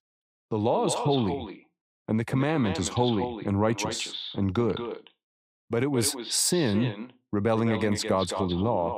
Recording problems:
echo of what is said; strong; throughout; 210 ms later, 9 dB below the speech

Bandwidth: 15.5 kHz